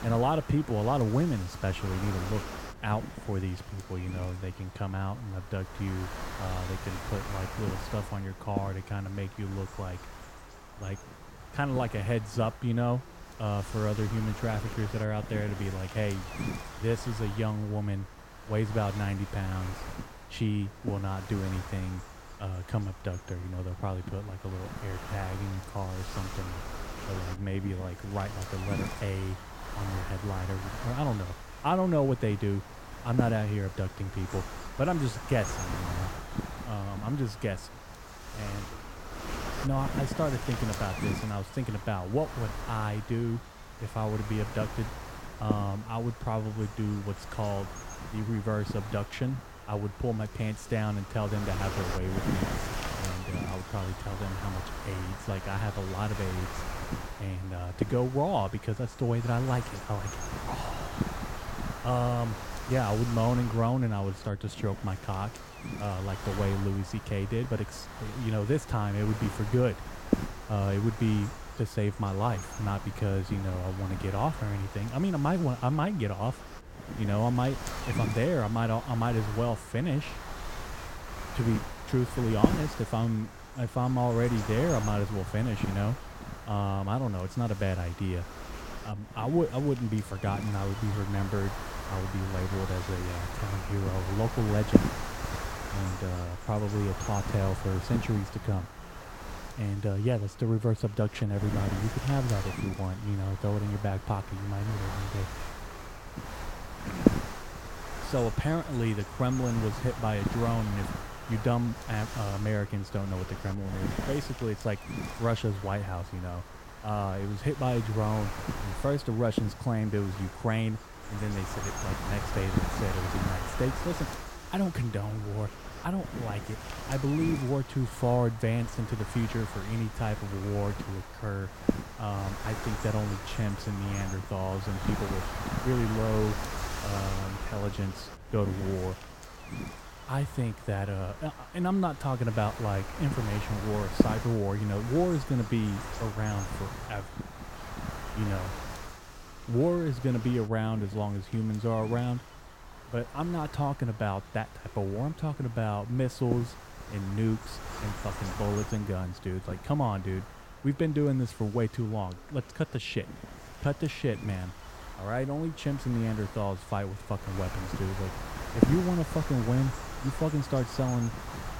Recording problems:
wind noise on the microphone; heavy; 5 dB below the speech
background chatter; faint; throughout; 3 voices, 30 dB below the speech

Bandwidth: 16.5 kHz